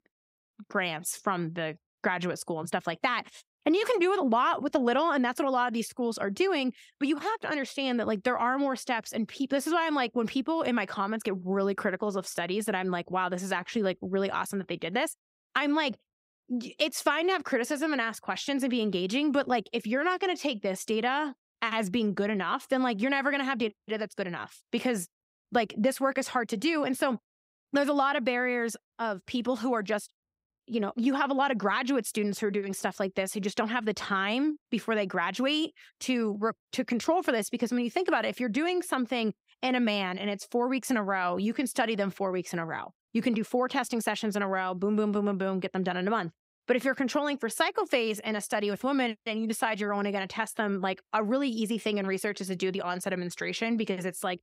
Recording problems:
none

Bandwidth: 15.5 kHz